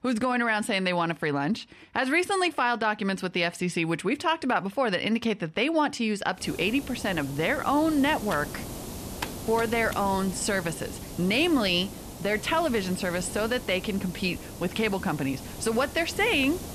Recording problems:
hiss; noticeable; from 6.5 s on; 10 dB below the speech
keyboard typing; faint; from 8.5 to 10 s; peak 10 dB below the speech

